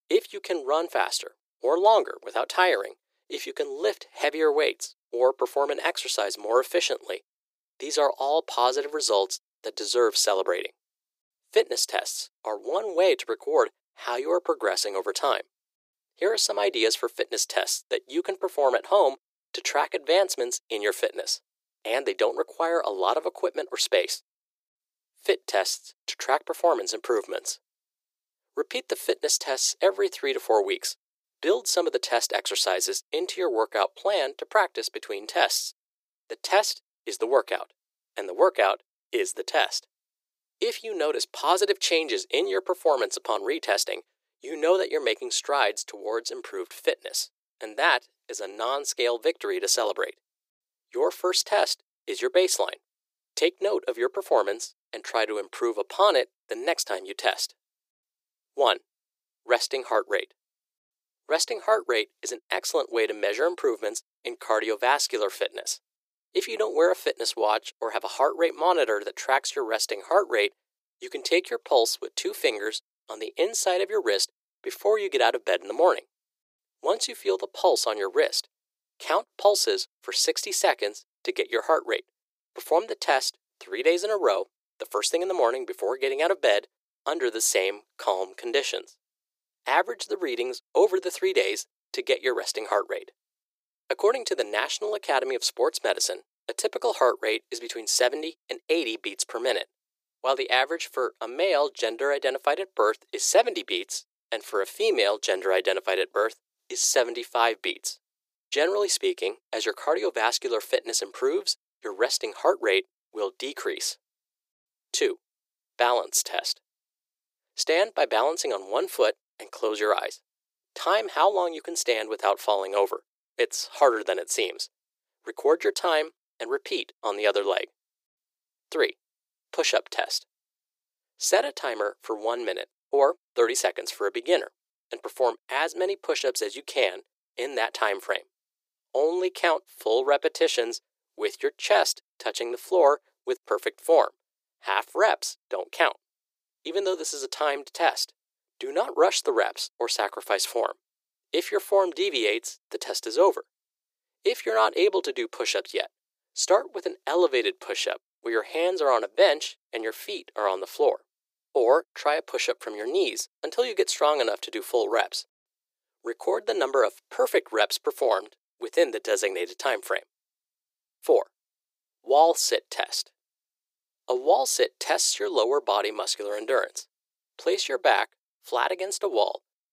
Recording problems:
thin; very; fading below 350 Hz

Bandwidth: 15 kHz